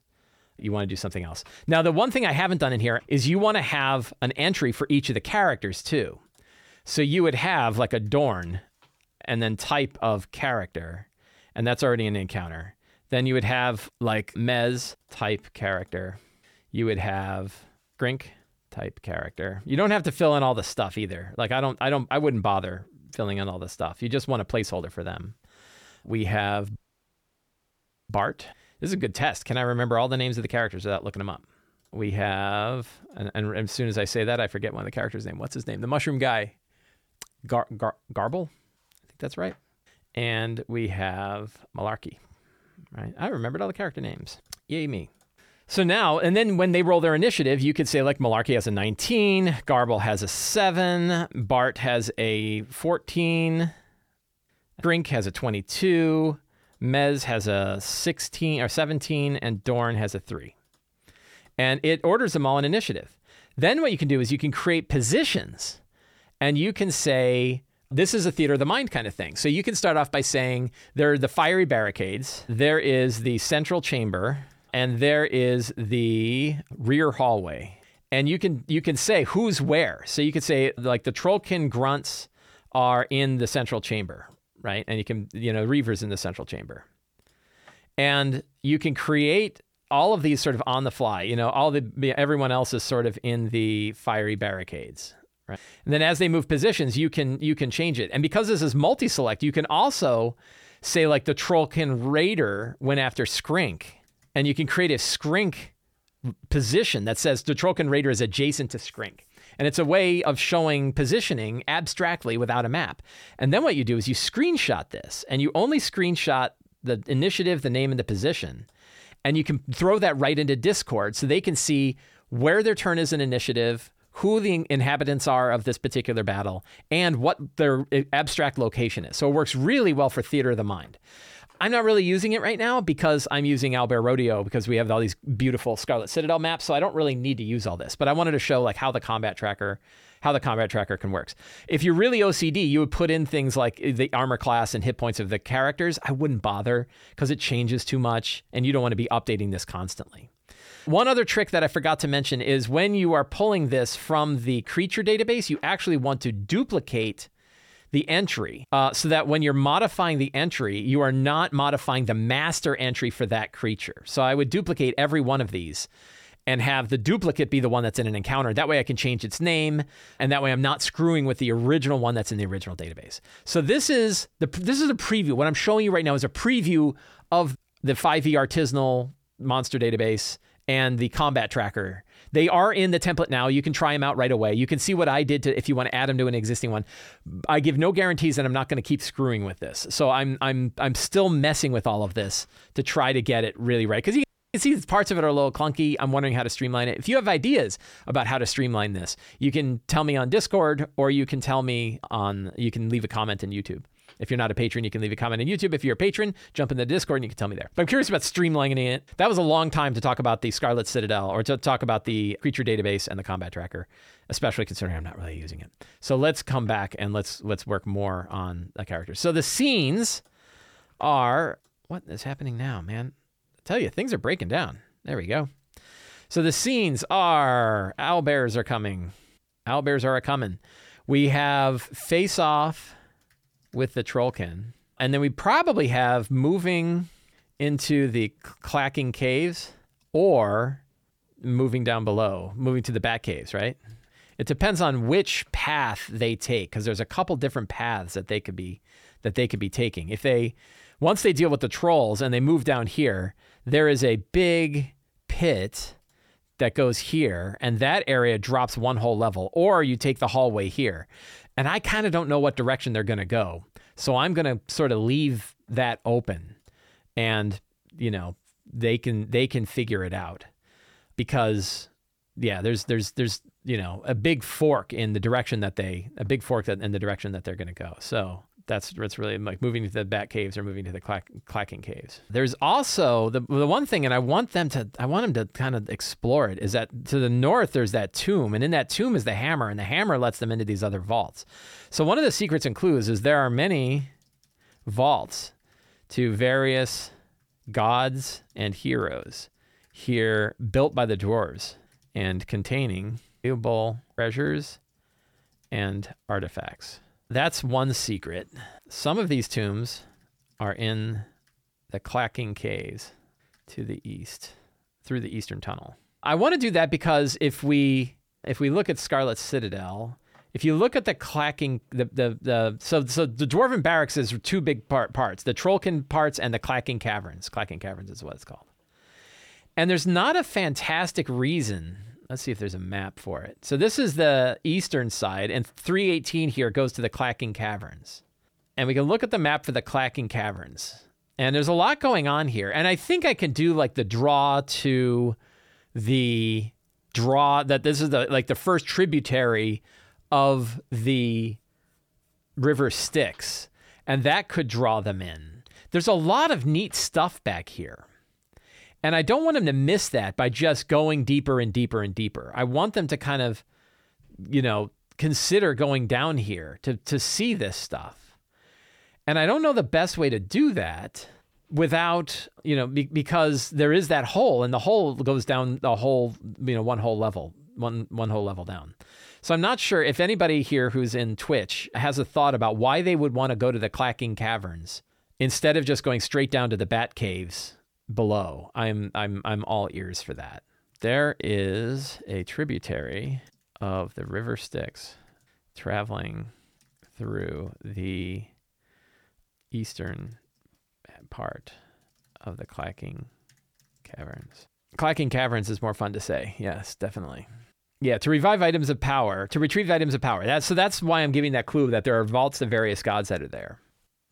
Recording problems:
audio cutting out; at 27 s for 1.5 s and at 3:14

